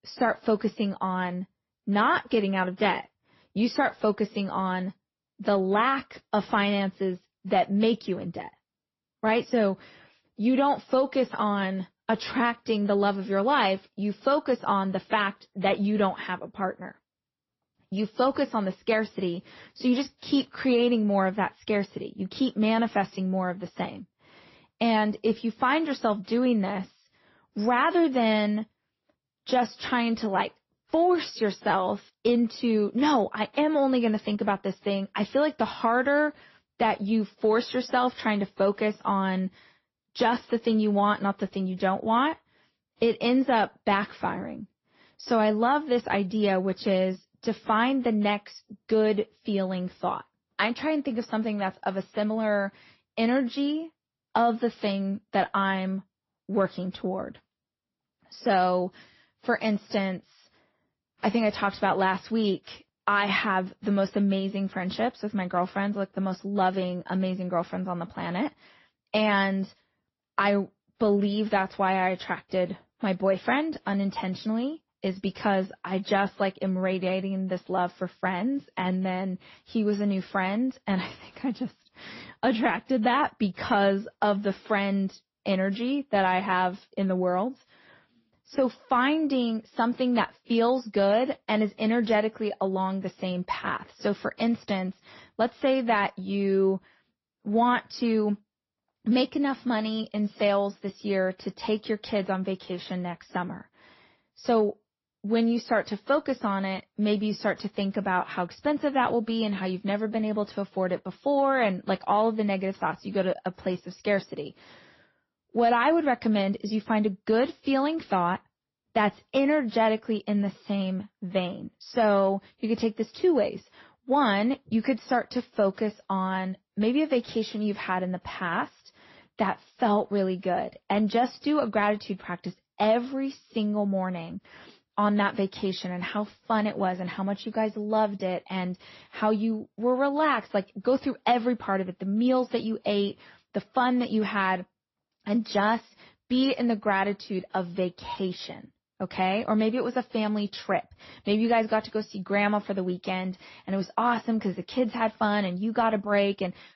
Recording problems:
garbled, watery; slightly; nothing above 5.5 kHz
high frequencies cut off; slight

